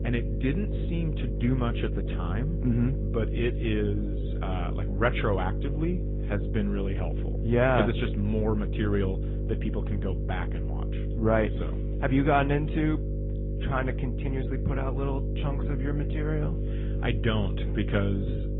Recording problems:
high frequencies cut off; severe; nothing above 3.5 kHz
garbled, watery; slightly
electrical hum; loud; throughout; 50 Hz, 9 dB below the speech

